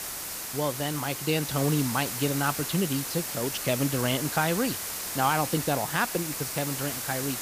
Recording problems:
hiss; loud; throughout; 3 dB below the speech

